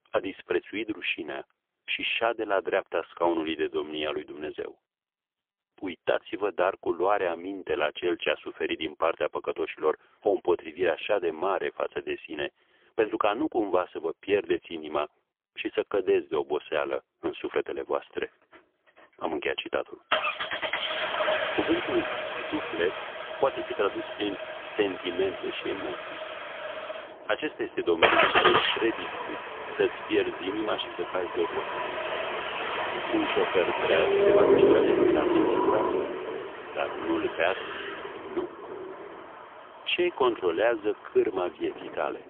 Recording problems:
phone-call audio; poor line; nothing above 3.5 kHz
traffic noise; very loud; from 18 s on; 1 dB above the speech

